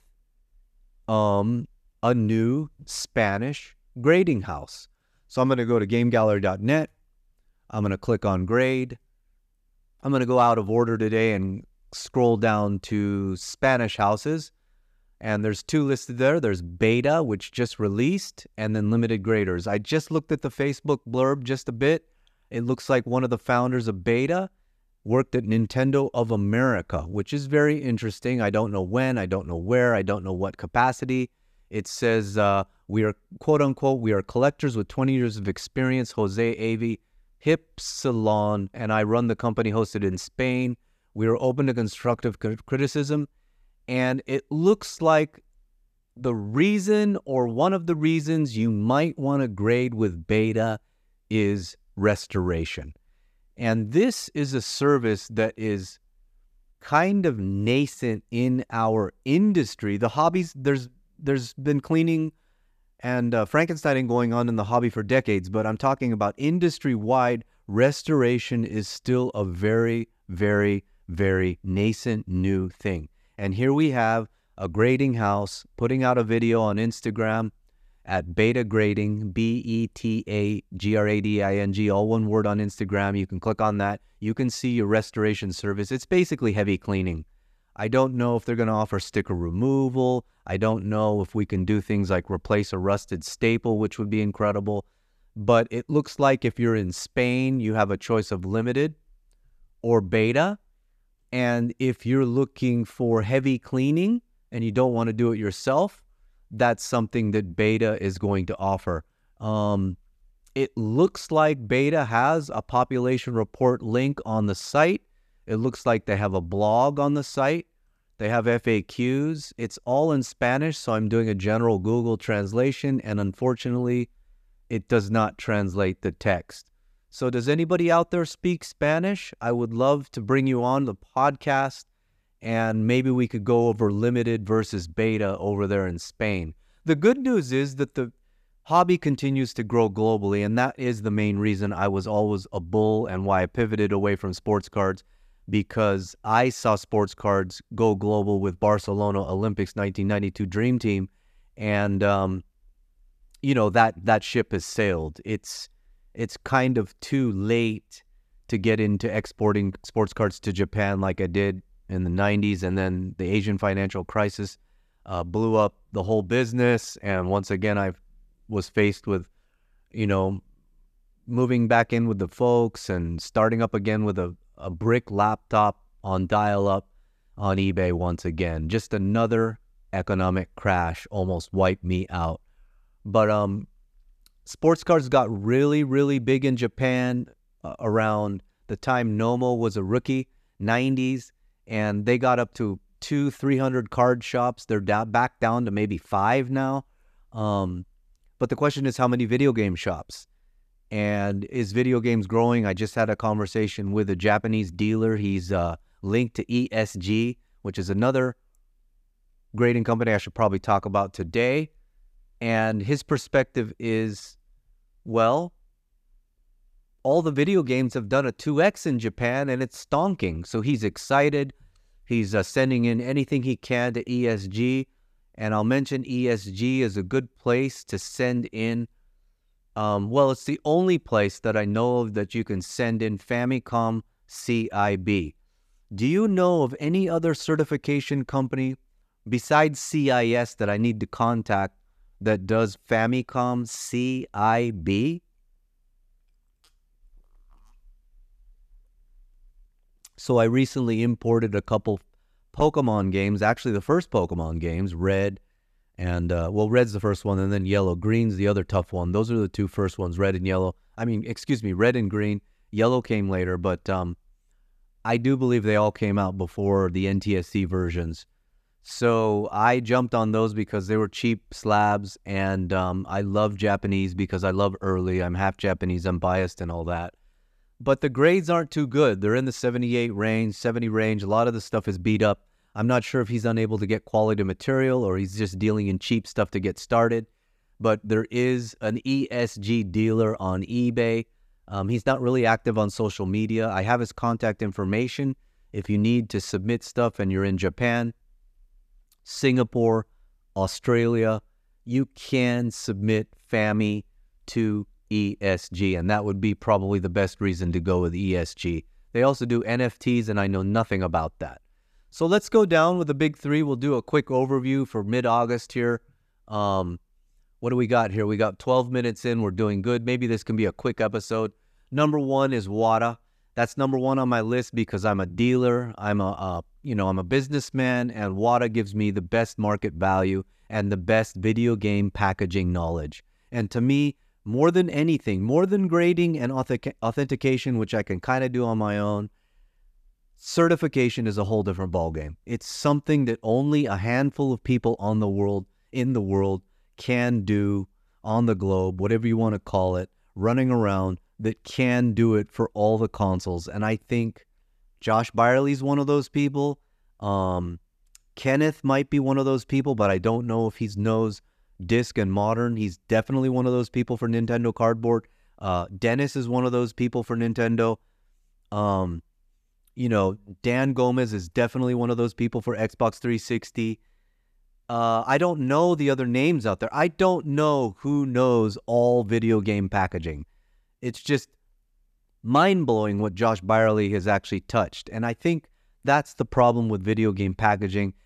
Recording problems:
none

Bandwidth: 14.5 kHz